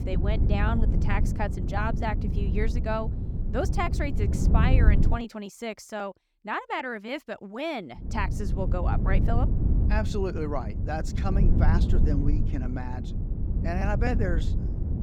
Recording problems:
wind noise on the microphone; heavy; until 5 s and from 8 s on; 7 dB below the speech

